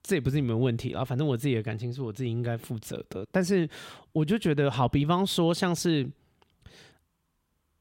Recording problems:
none

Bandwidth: 16 kHz